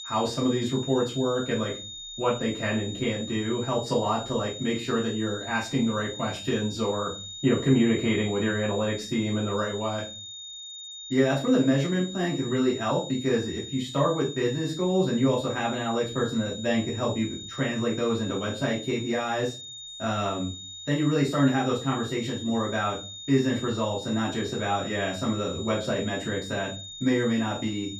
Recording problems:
off-mic speech; far
room echo; slight; dies away in 0.3 s
high-pitched whine; noticeable; throughout; 3.5 kHz, 10 dB below the speech

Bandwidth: 15.5 kHz